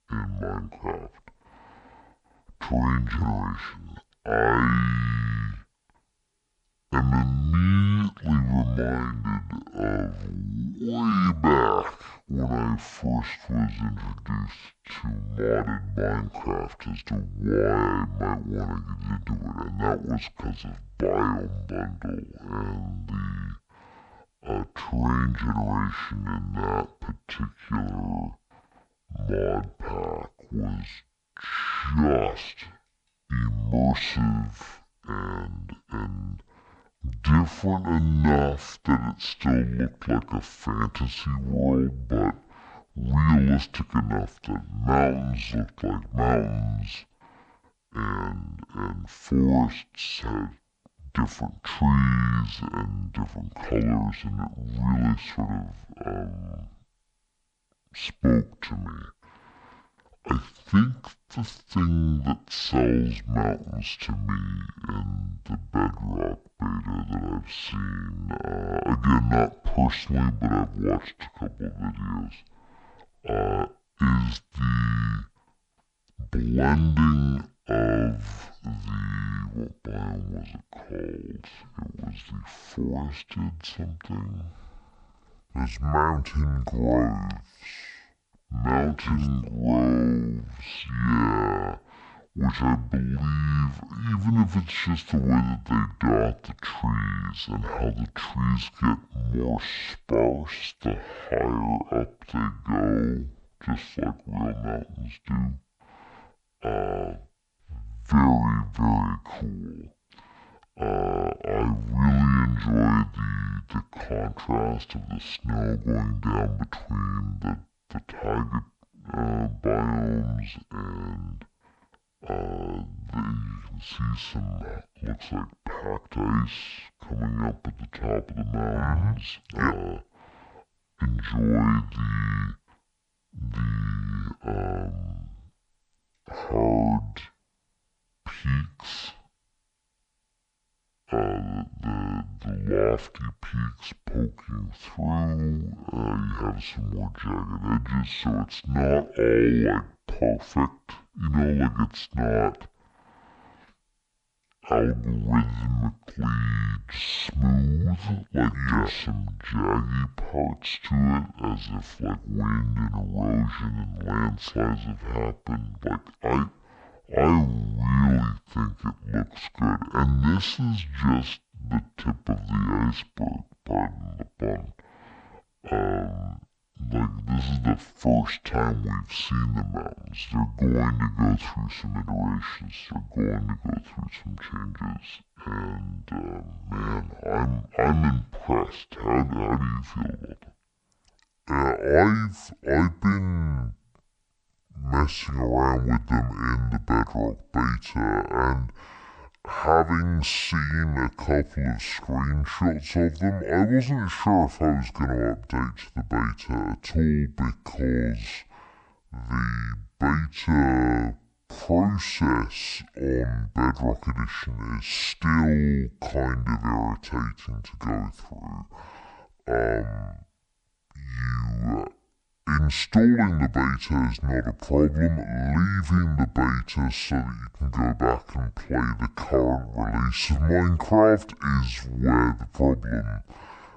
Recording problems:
wrong speed and pitch; too slow and too low; 0.5 times normal speed

